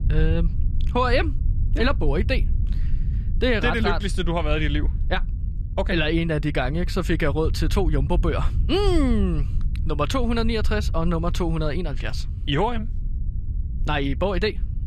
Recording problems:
low rumble; noticeable; throughout; 20 dB below the speech

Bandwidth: 13.5 kHz